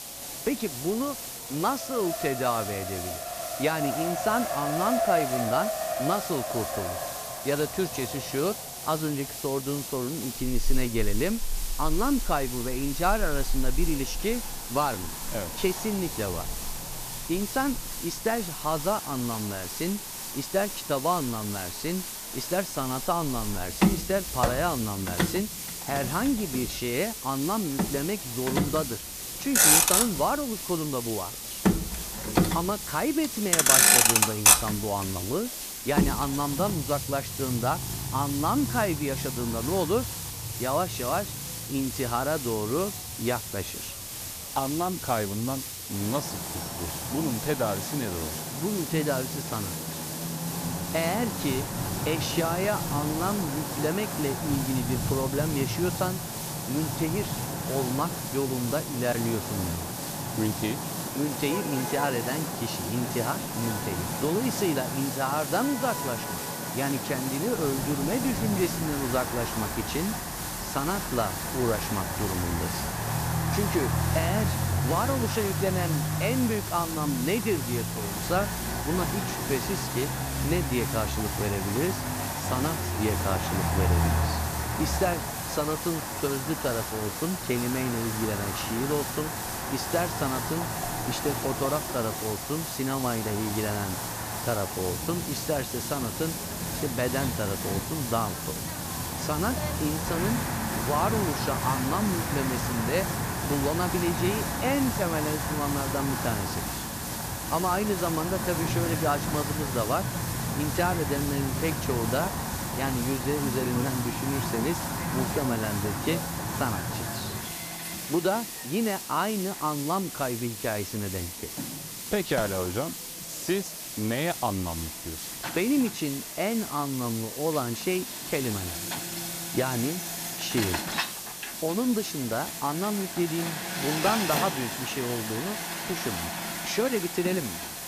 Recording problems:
traffic noise; loud; throughout; as loud as the speech
hiss; loud; throughout; 5 dB below the speech
chatter from many people; faint; throughout; 25 dB below the speech

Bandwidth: 14.5 kHz